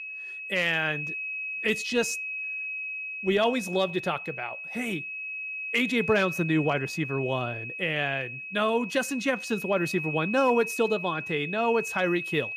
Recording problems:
high-pitched whine; loud; throughout; 2.5 kHz, 5 dB below the speech

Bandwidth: 15 kHz